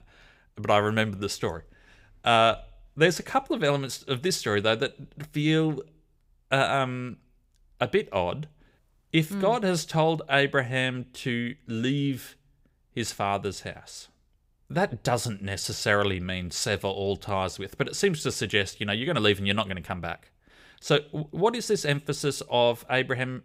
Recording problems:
none

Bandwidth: 15.5 kHz